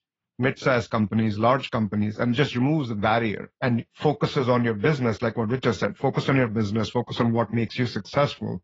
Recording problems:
garbled, watery; badly; nothing above 7 kHz
muffled; very slightly; fading above 4.5 kHz

